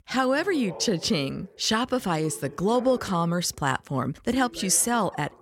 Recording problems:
voice in the background; noticeable; throughout; 20 dB below the speech

